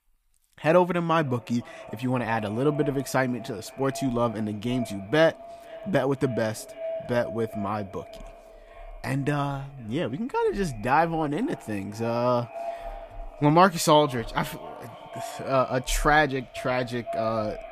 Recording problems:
echo of what is said; noticeable; throughout; 510 ms later, 15 dB below the speech

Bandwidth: 15 kHz